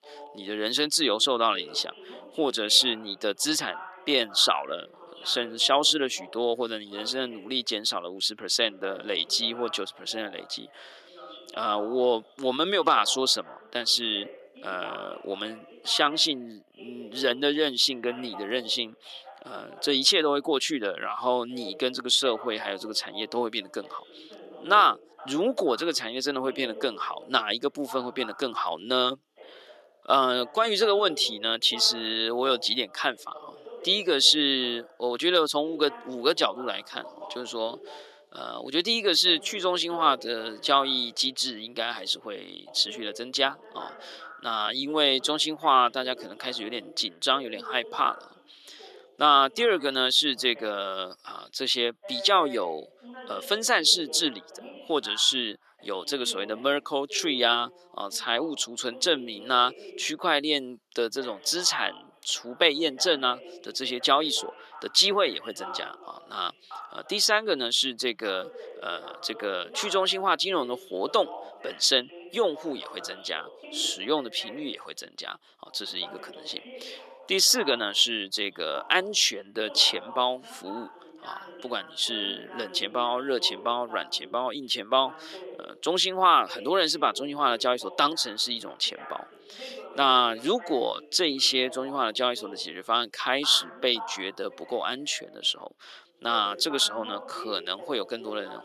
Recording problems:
thin; somewhat; fading below 350 Hz
voice in the background; noticeable; throughout; 20 dB below the speech

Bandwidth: 13.5 kHz